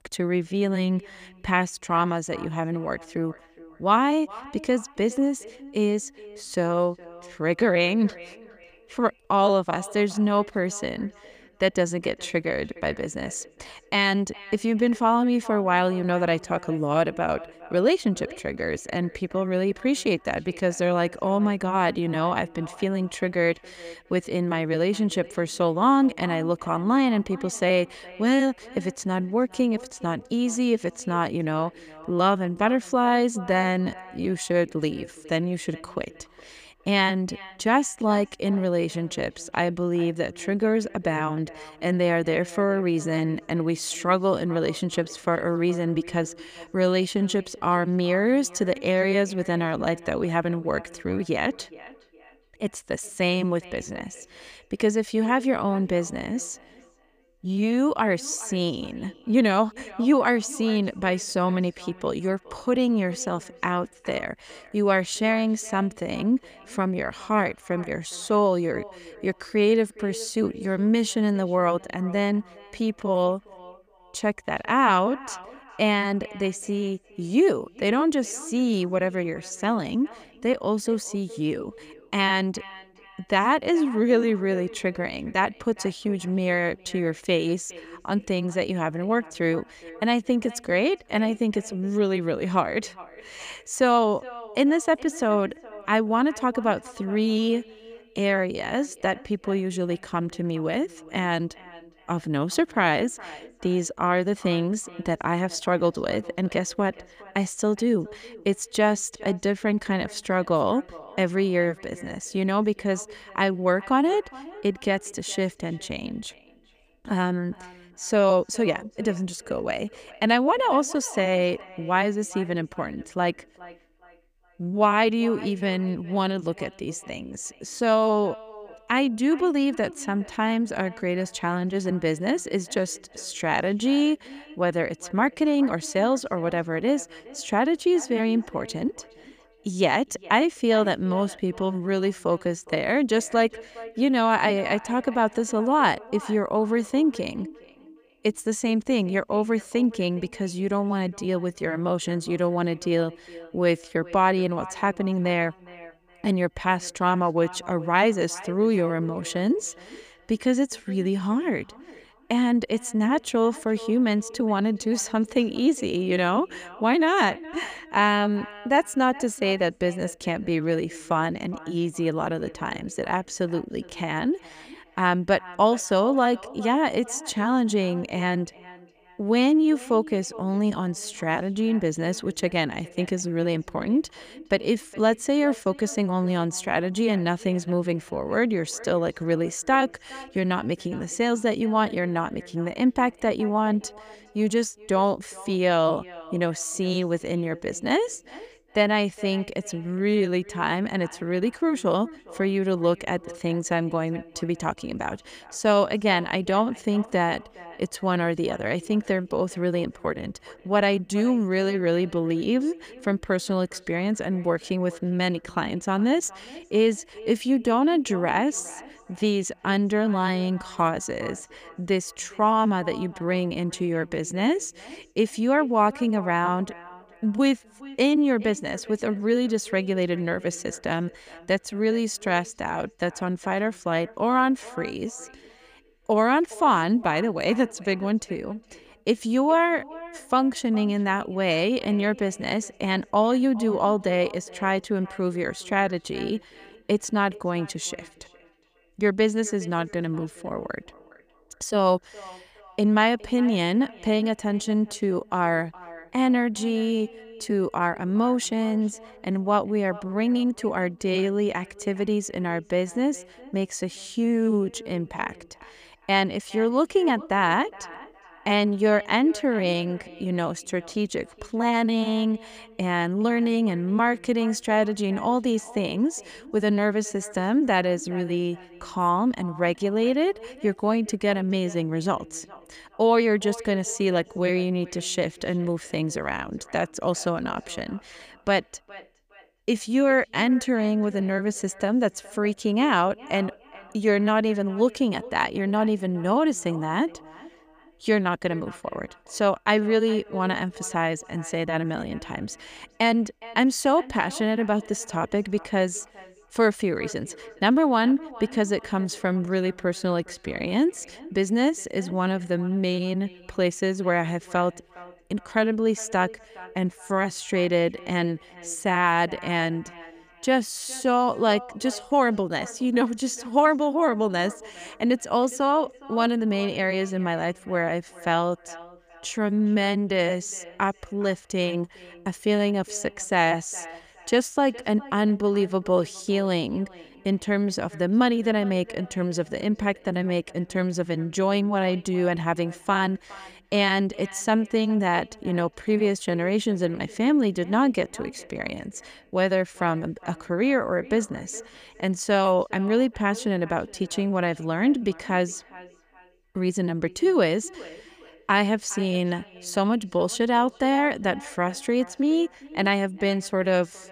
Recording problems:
echo of what is said; faint; throughout; 410 ms later, 20 dB below the speech

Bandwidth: 15 kHz